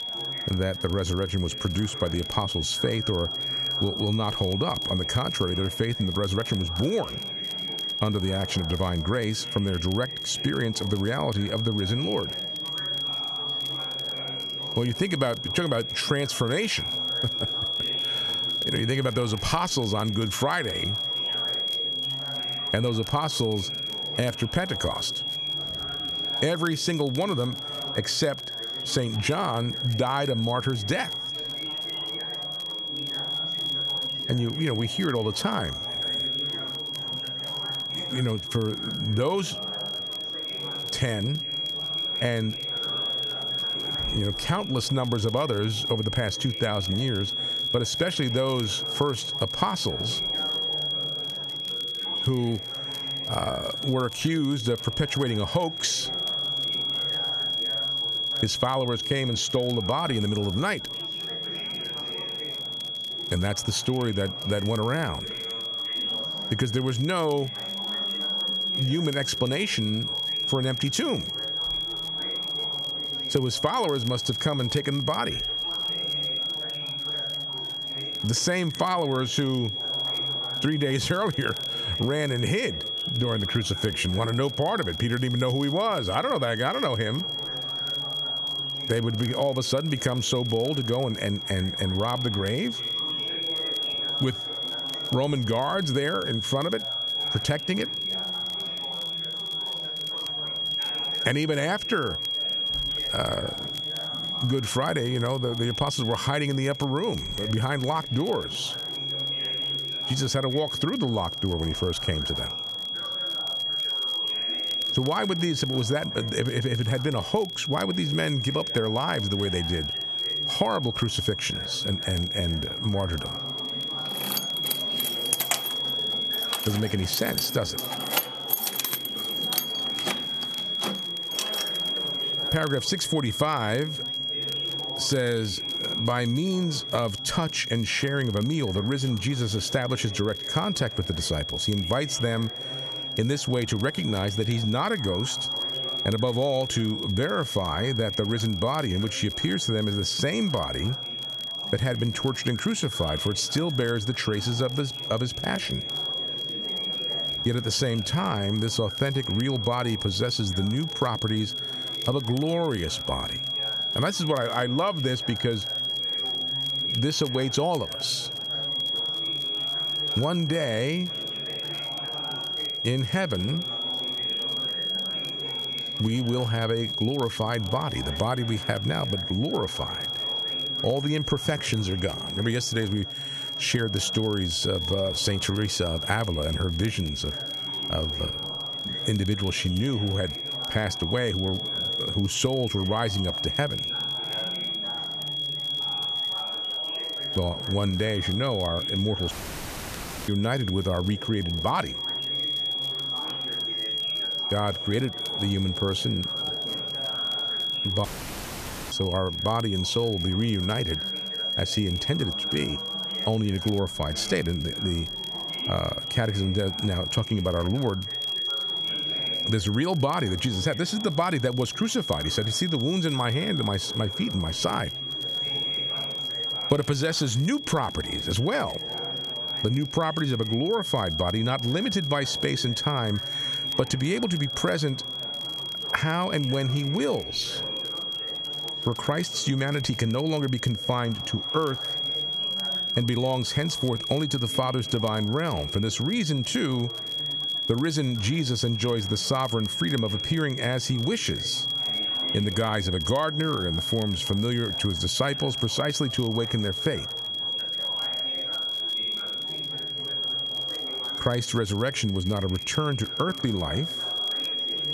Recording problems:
squashed, flat; somewhat
high-pitched whine; loud; throughout; 3.5 kHz, 2 dB below the speech
chatter from many people; noticeable; throughout; 15 dB below the speech
crackle, like an old record; faint; 25 dB below the speech
jangling keys; loud; from 2:04 to 2:12; peak 3 dB above the speech
audio cutting out; at 3:19 for 1 s and at 3:28 for 1 s

